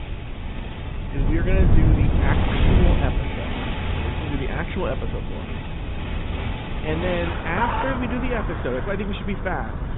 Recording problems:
high frequencies cut off; severe; nothing above 3.5 kHz
garbled, watery; slightly
wind noise on the microphone; heavy; 7 dB below the speech
traffic noise; loud; throughout; 2 dB below the speech

